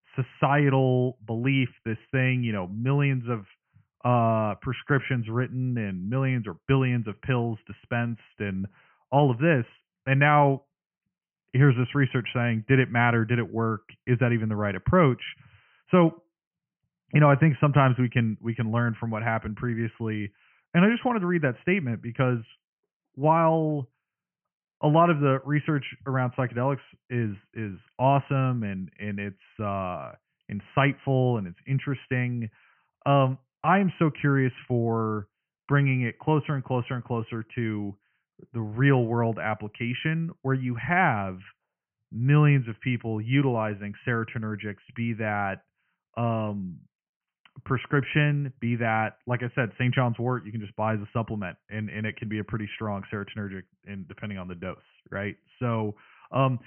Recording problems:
high frequencies cut off; severe; nothing above 3 kHz

